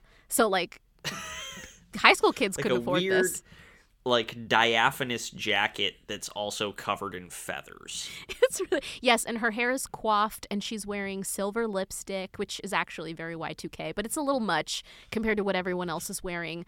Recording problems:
none

